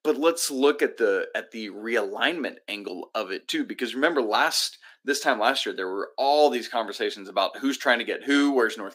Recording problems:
thin; very slightly; fading below 250 Hz

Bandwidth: 15.5 kHz